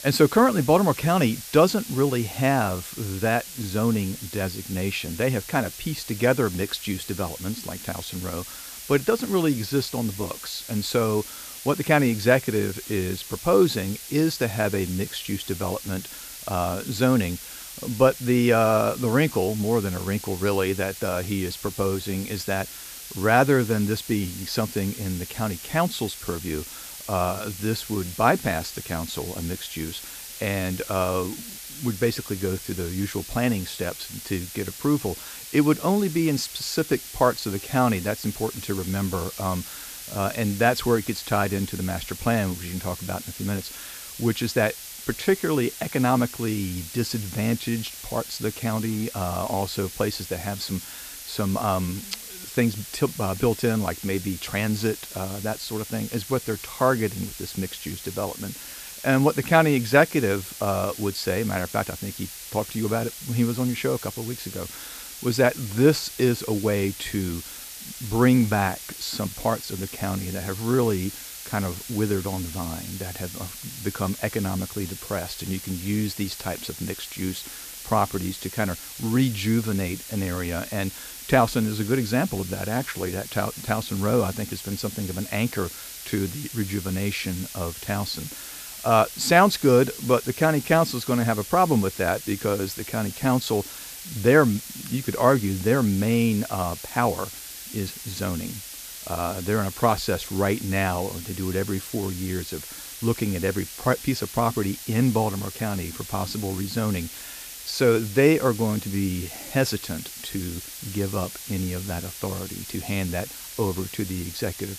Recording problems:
hiss; noticeable; throughout; 10 dB below the speech

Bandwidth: 14.5 kHz